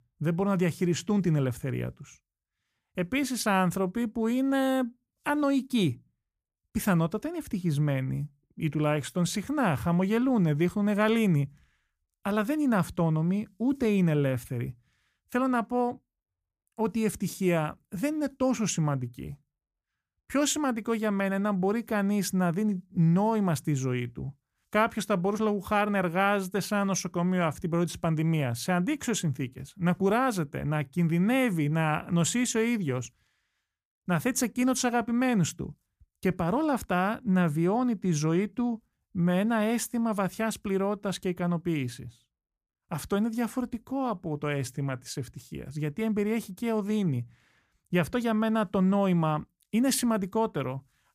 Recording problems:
none

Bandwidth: 15 kHz